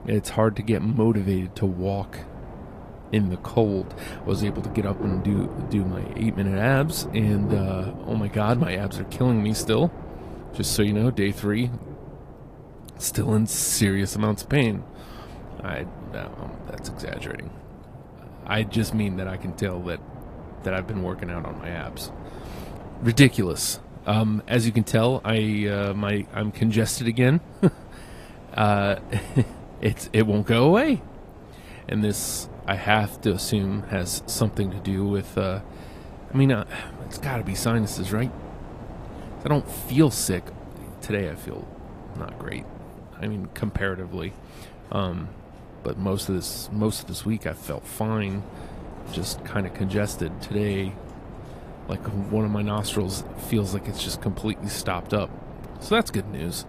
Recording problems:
garbled, watery; slightly; nothing above 15 kHz
rain or running water; noticeable; throughout; 15 dB below the speech
wind noise on the microphone; occasional gusts; 15 dB below the speech

